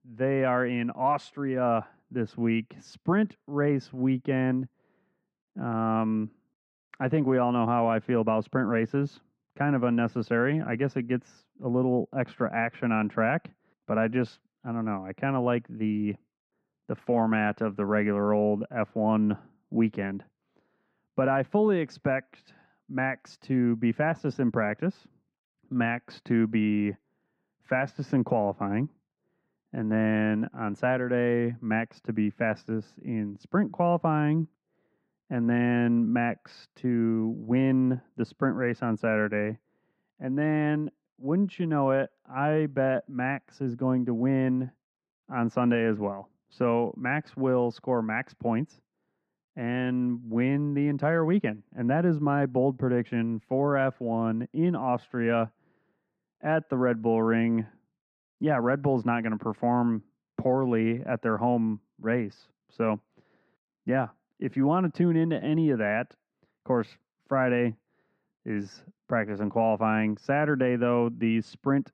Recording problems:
muffled; very; fading above 1.5 kHz

